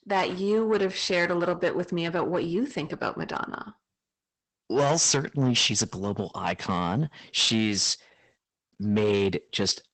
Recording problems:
garbled, watery; badly; nothing above 8 kHz
distortion; slight; 10 dB below the speech

